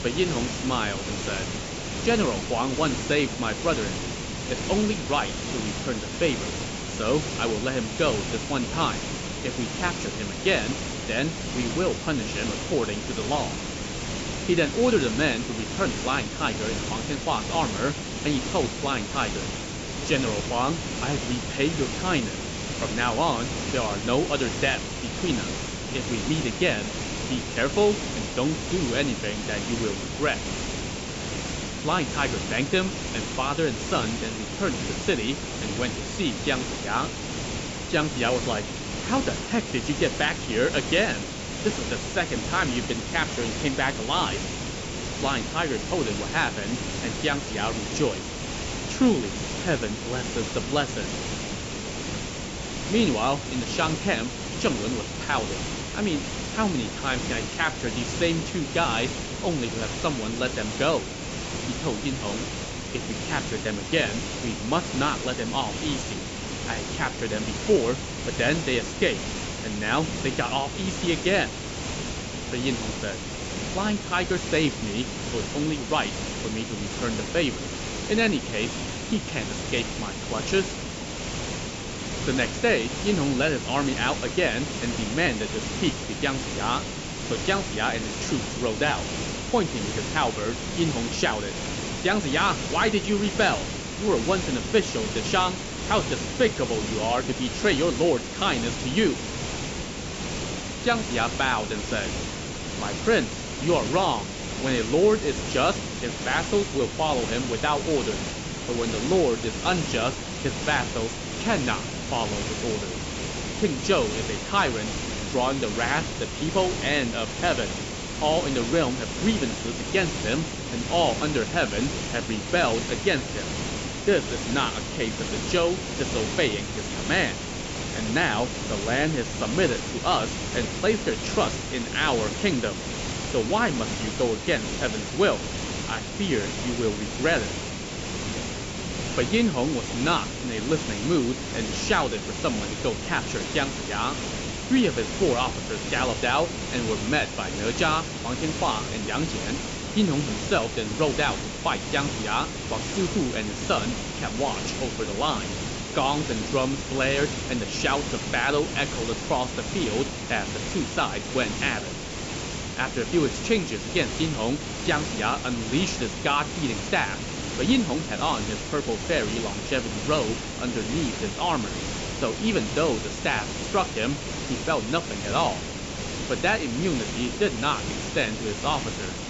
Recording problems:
high frequencies cut off; noticeable; nothing above 8 kHz
hiss; loud; throughout; 4 dB below the speech

